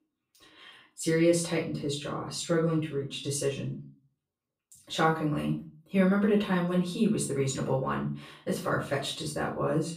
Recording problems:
off-mic speech; far
room echo; slight; dies away in 0.3 s

